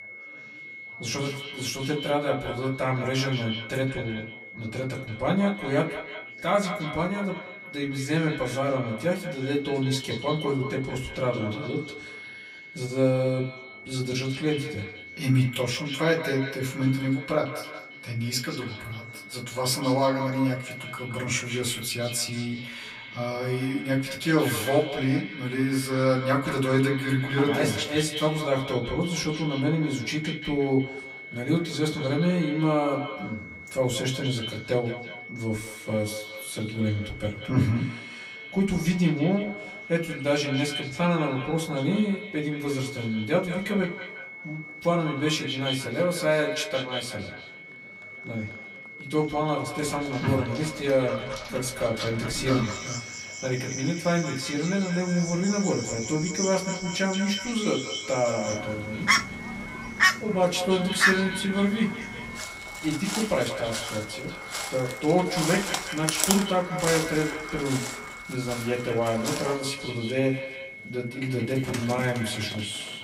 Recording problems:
echo of what is said; strong; throughout; 180 ms later, 10 dB below the speech
off-mic speech; far
room echo; very slight; dies away in 0.2 s
animal sounds; loud; from 50 s on; 4 dB below the speech
high-pitched whine; noticeable; throughout; 2 kHz, 15 dB below the speech
chatter from many people; faint; throughout; 25 dB below the speech

